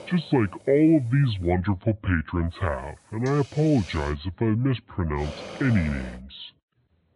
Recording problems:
high frequencies cut off; severe; nothing above 4 kHz
wrong speed and pitch; too slow and too low; 0.7 times normal speed
hiss; noticeable; until 1.5 s, from 2.5 to 4 s and at 5 s; 20 dB below the speech

